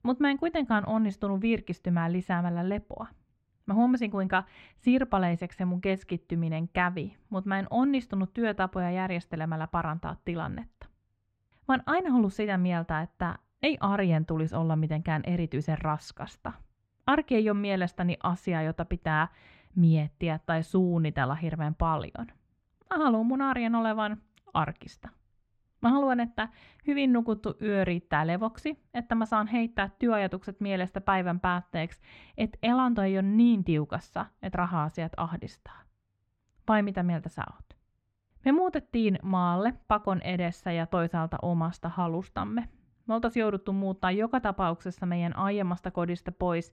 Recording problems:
muffled; slightly; fading above 2.5 kHz

